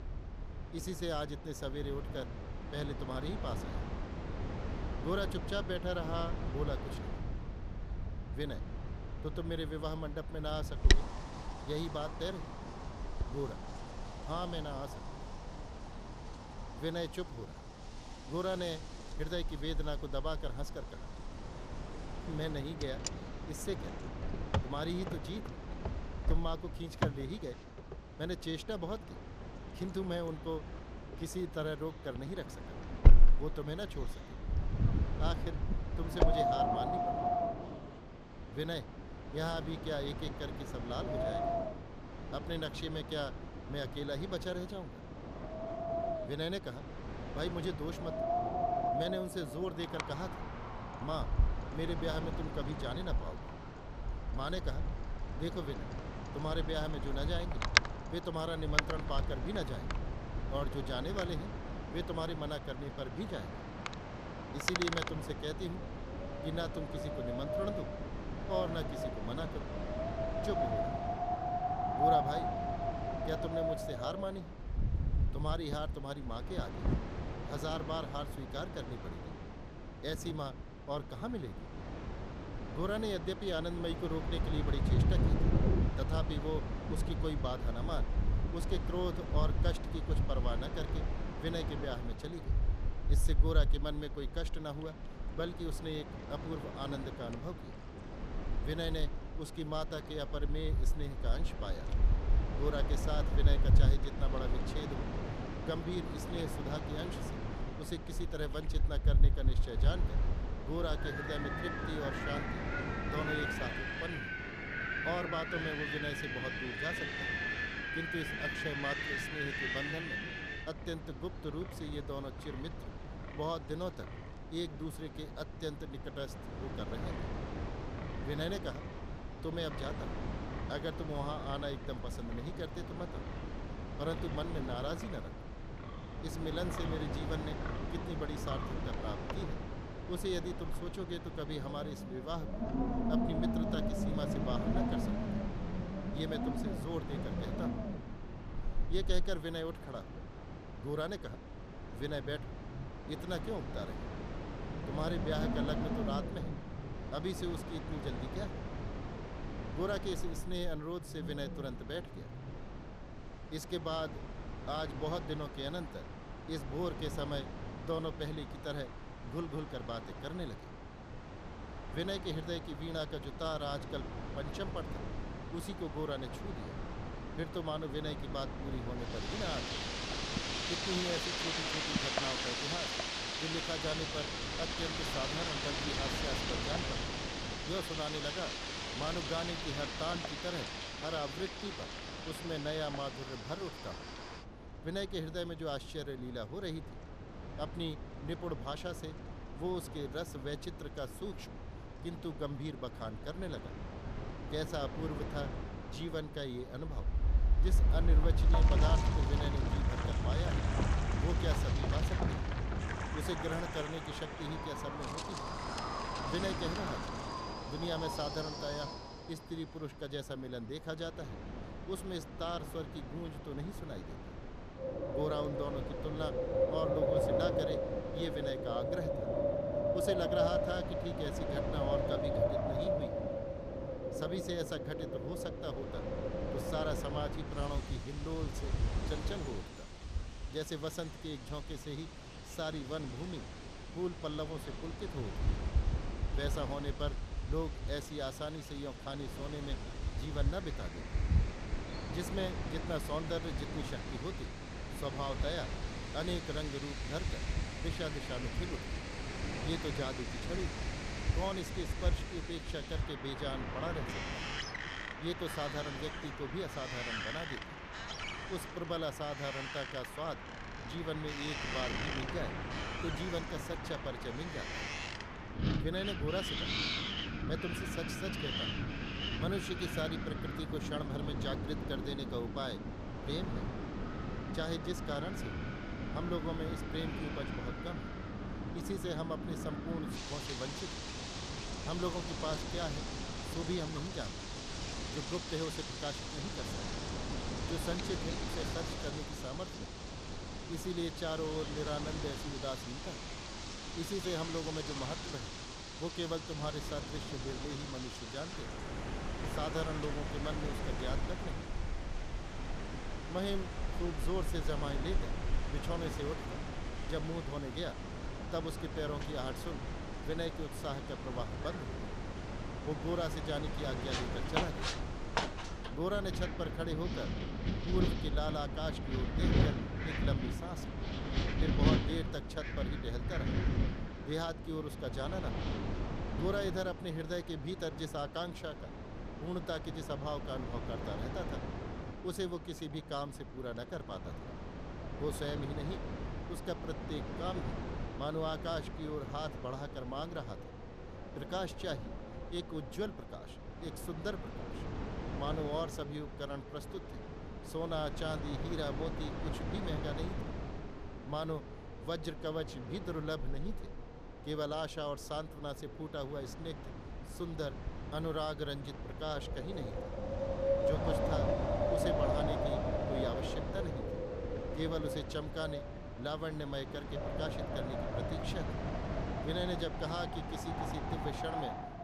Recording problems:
wind in the background; very loud; throughout; 2 dB above the speech

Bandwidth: 14.5 kHz